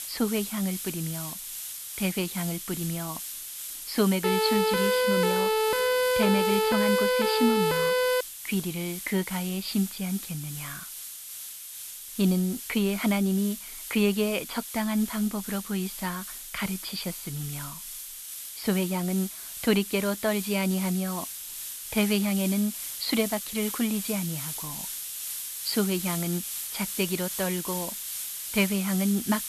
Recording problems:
high frequencies cut off; noticeable; nothing above 5.5 kHz
hiss; loud; throughout; 6 dB below the speech
siren; loud; from 4 to 8 s; peak 5 dB above the speech

